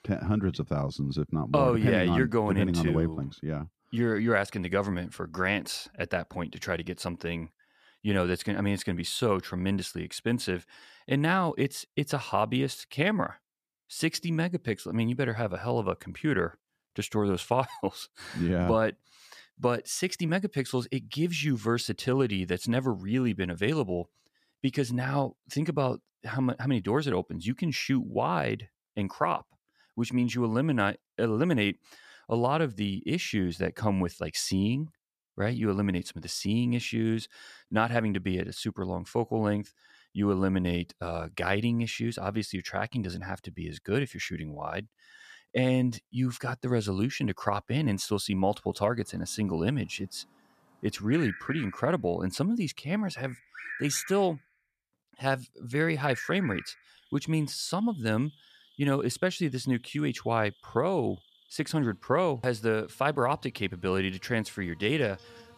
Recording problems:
animal sounds; noticeable; from 49 s on; 15 dB below the speech

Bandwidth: 14.5 kHz